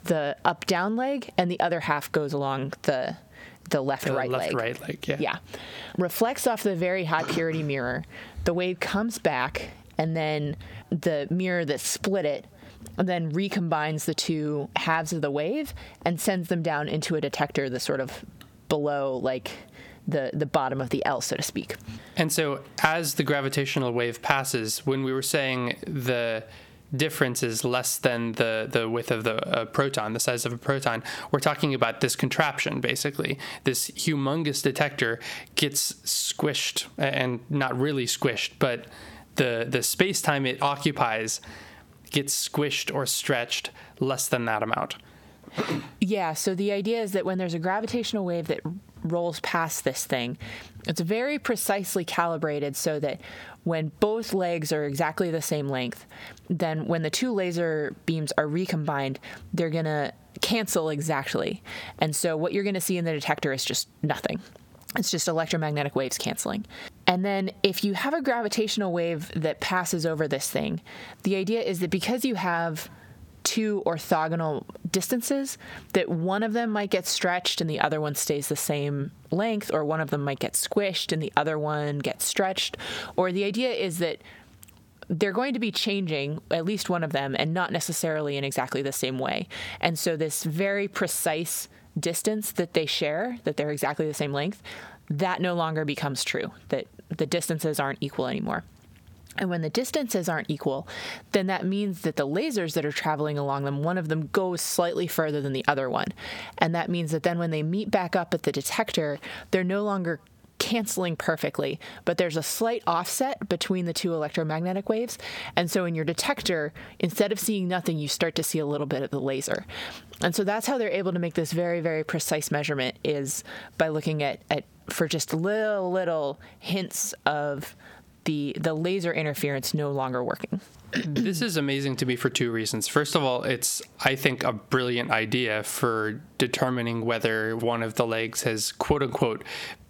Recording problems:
squashed, flat; heavily

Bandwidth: 18 kHz